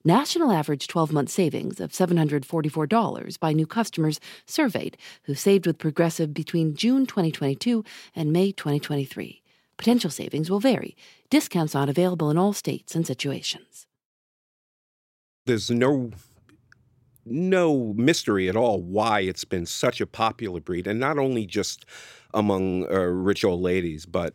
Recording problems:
none

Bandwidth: 16 kHz